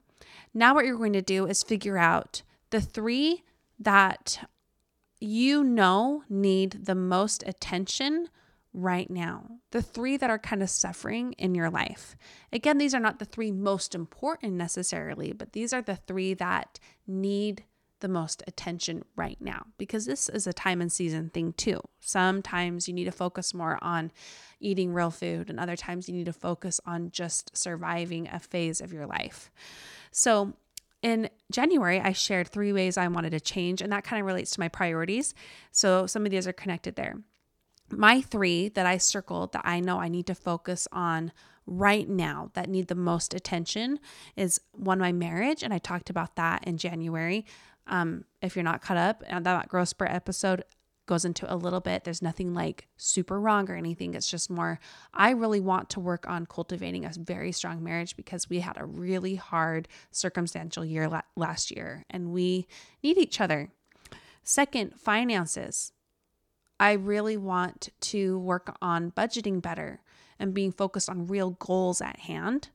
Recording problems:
none

